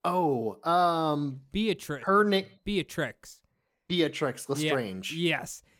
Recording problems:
none

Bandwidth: 17 kHz